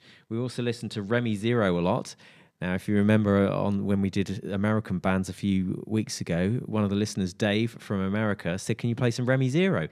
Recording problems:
none

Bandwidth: 15 kHz